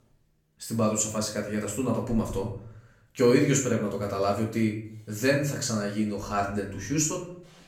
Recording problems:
off-mic speech; far
room echo; slight; dies away in 0.5 s

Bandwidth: 18.5 kHz